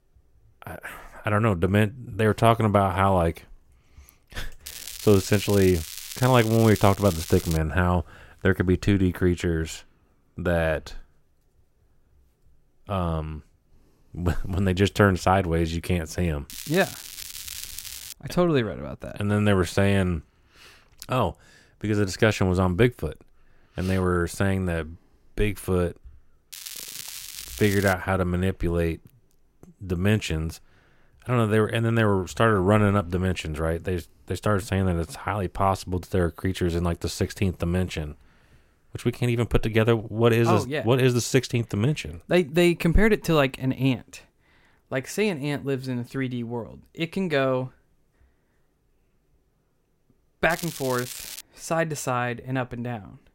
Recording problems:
crackling; noticeable; 4 times, first at 4.5 s; 10 dB below the speech

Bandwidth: 16 kHz